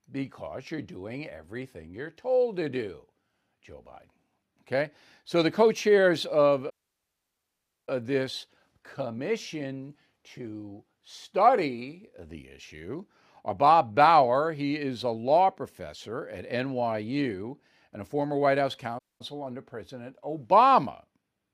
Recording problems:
audio cutting out; at 6.5 s for 1 s and at 19 s

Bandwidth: 15 kHz